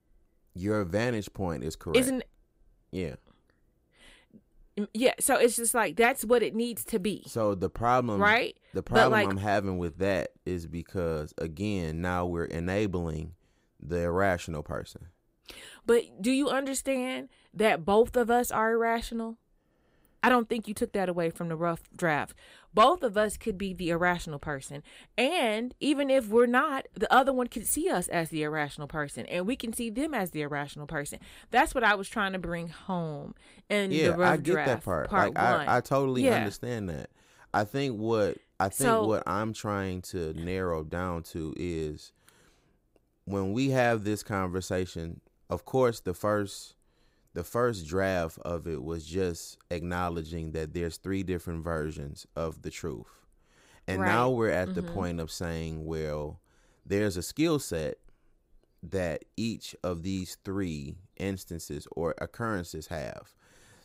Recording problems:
none

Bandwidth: 15.5 kHz